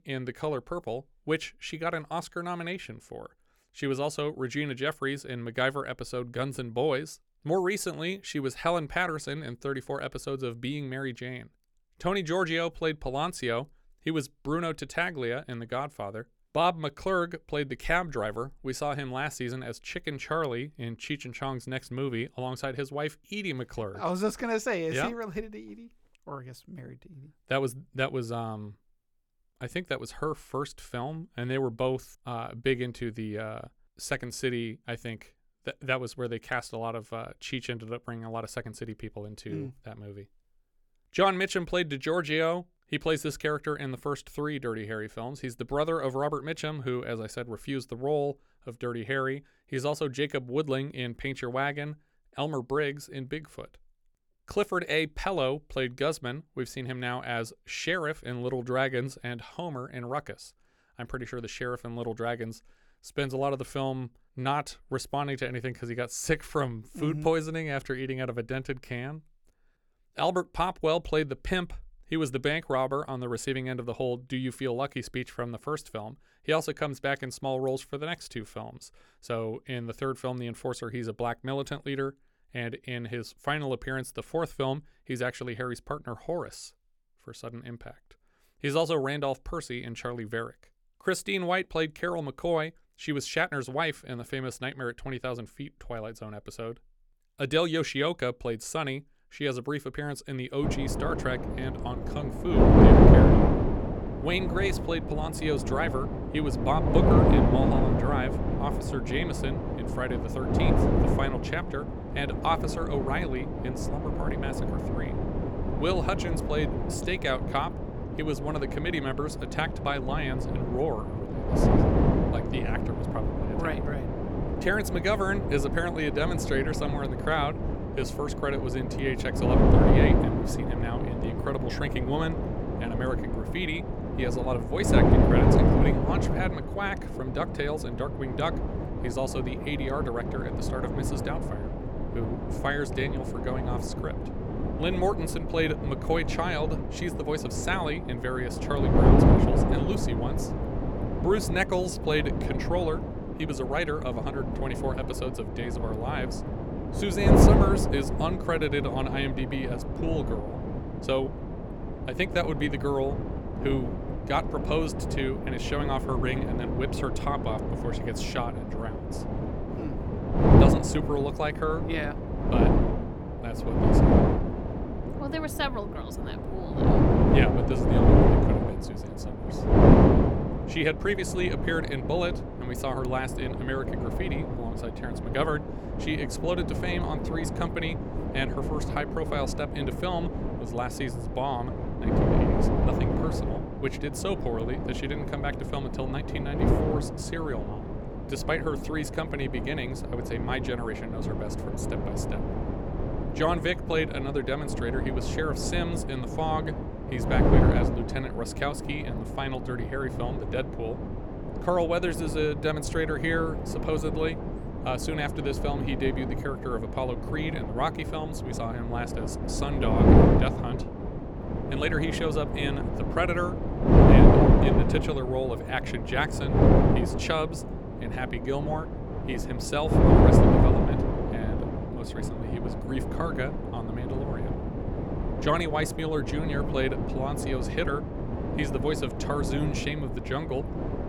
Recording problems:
wind noise on the microphone; heavy; from 1:41 on; as loud as the speech

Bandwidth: 18 kHz